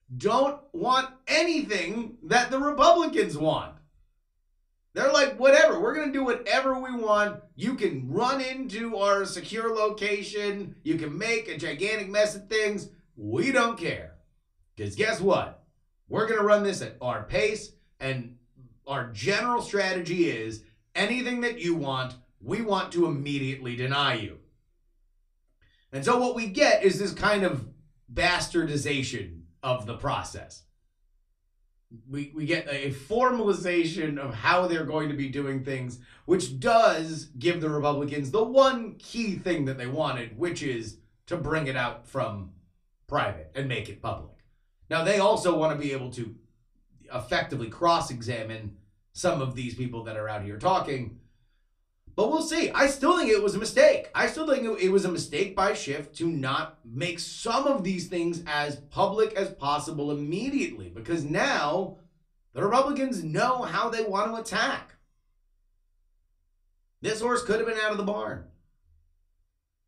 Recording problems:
off-mic speech; far
room echo; very slight; dies away in 0.3 s

